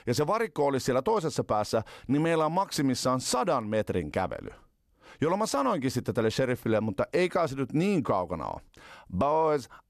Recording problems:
none

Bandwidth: 14 kHz